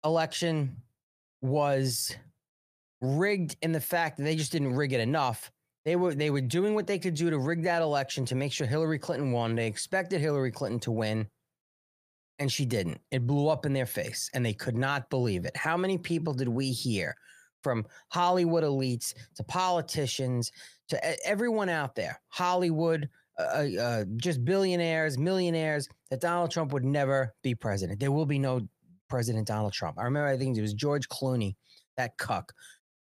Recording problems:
none

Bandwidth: 15 kHz